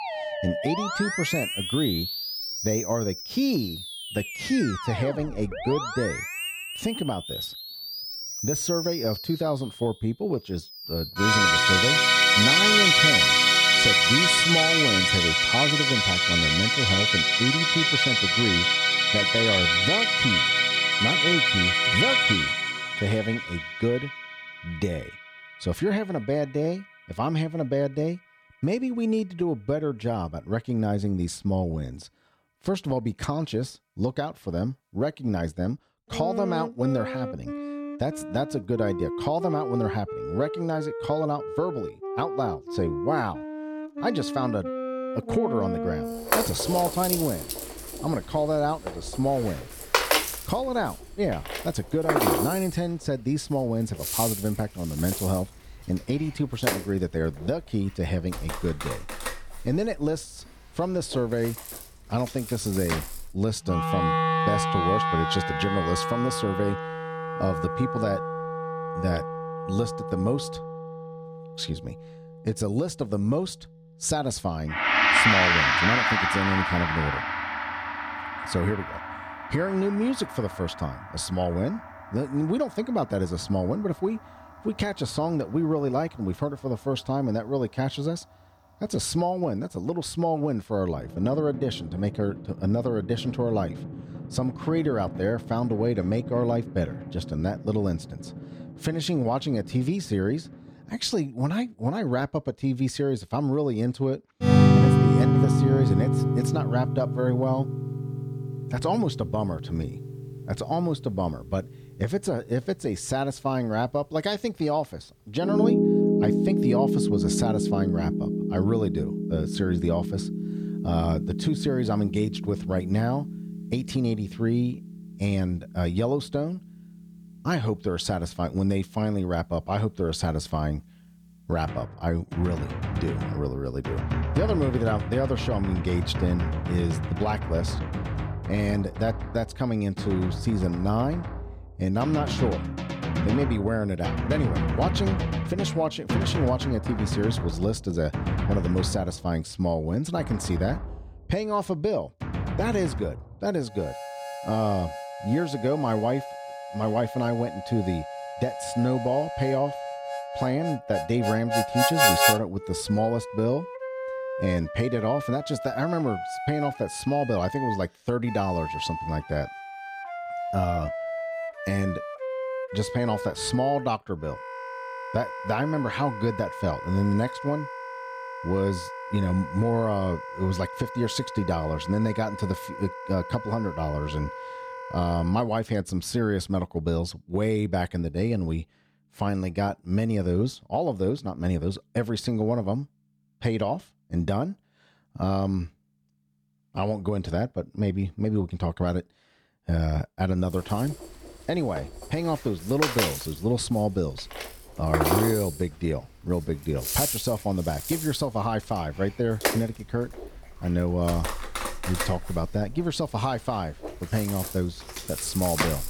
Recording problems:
background music; very loud; throughout; 2 dB above the speech

